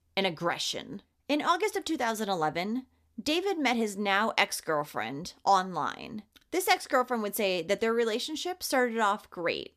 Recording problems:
none

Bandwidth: 14.5 kHz